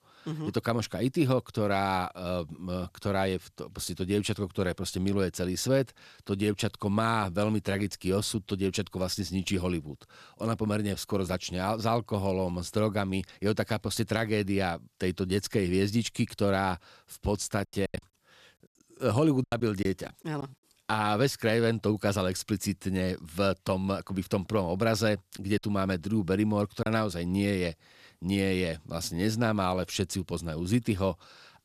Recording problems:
choppy; very; from 18 to 20 s and from 26 to 27 s; 8% of the speech affected

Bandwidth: 14.5 kHz